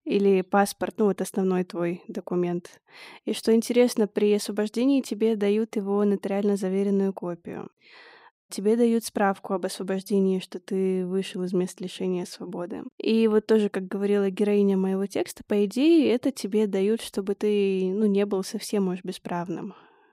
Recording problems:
none

